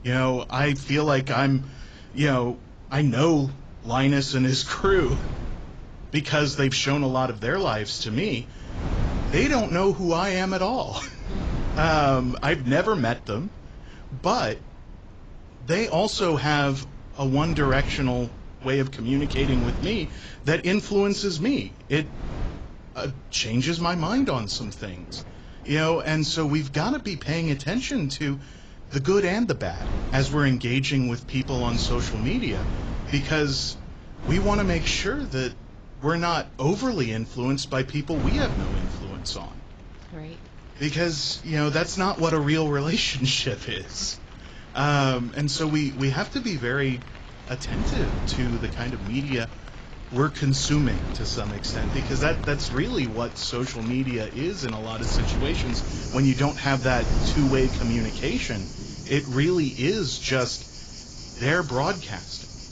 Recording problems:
garbled, watery; badly; nothing above 7.5 kHz
rain or running water; noticeable; throughout; 20 dB below the speech
wind noise on the microphone; occasional gusts; 15 dB below the speech

